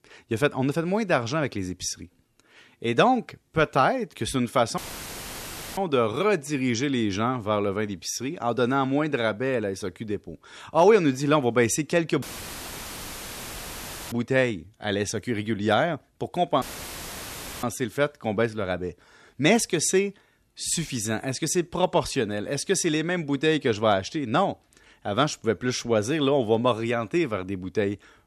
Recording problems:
audio cutting out; filled with static; at 5 s for 1 s, at 12 s for 2 s and at 17 s for 1 s

